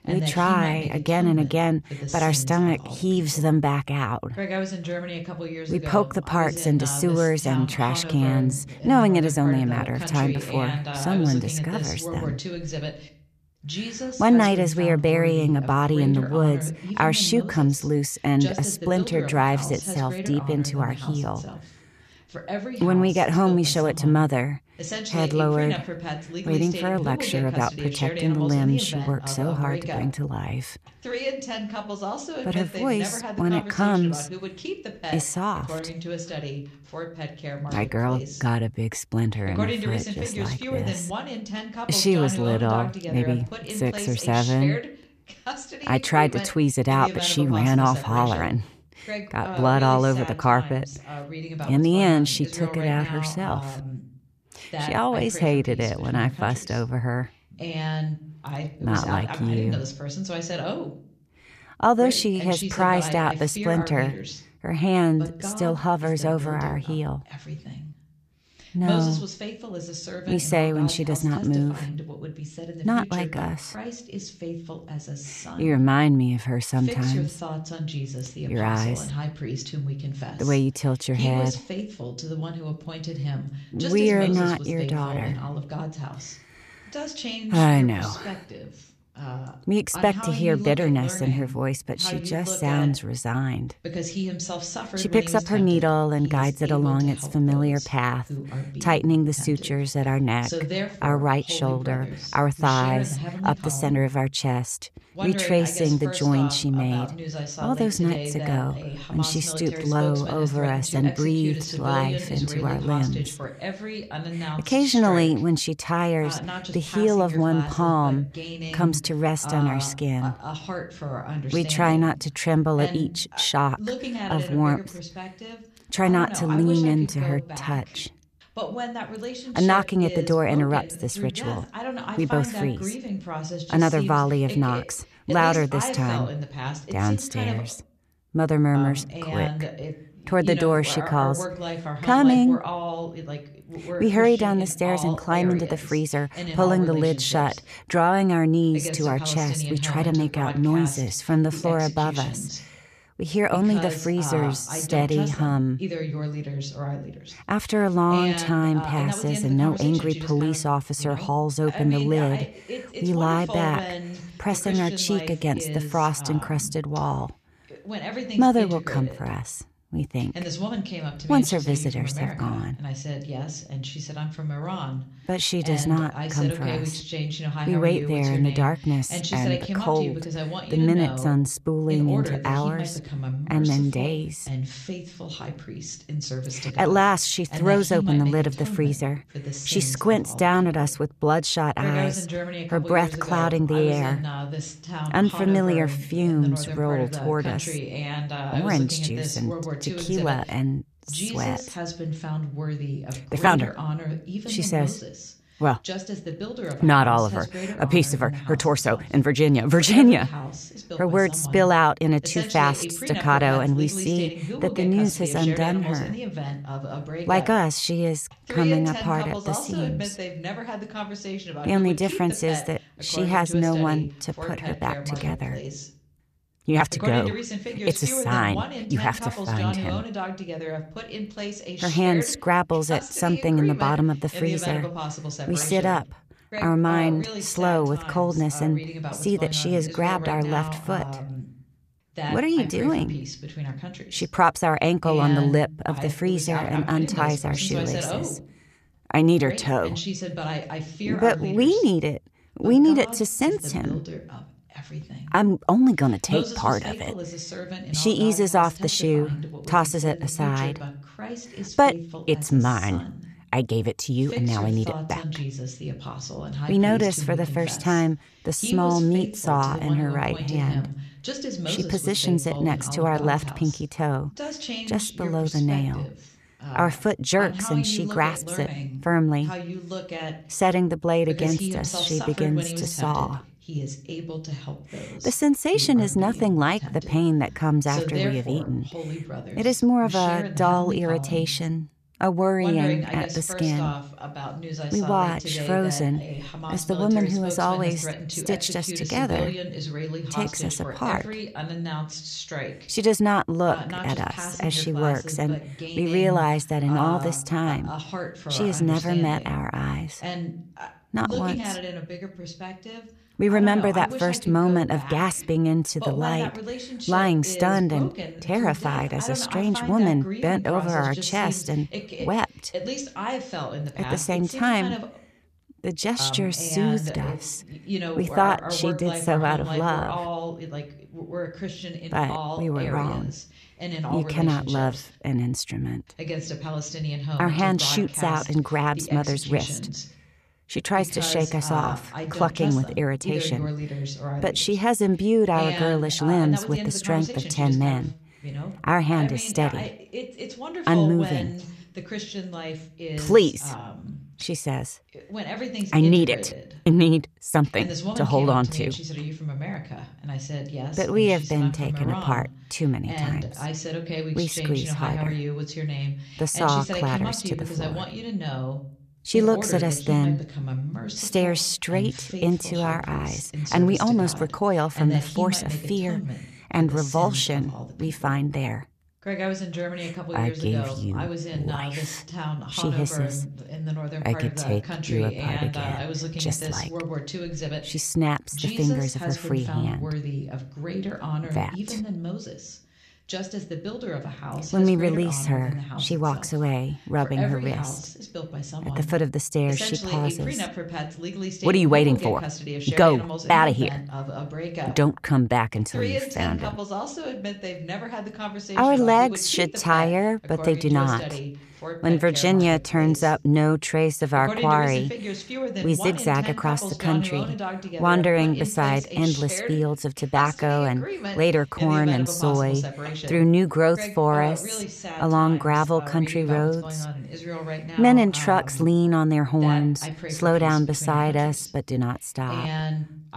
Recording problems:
voice in the background; loud; throughout; 9 dB below the speech

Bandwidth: 14.5 kHz